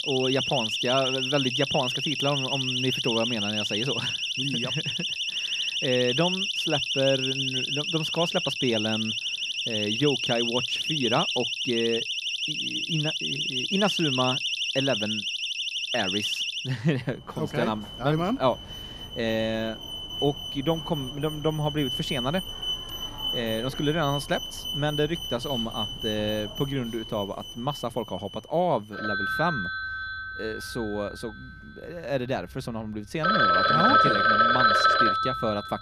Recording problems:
alarms or sirens; very loud; throughout; 3 dB above the speech

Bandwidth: 14.5 kHz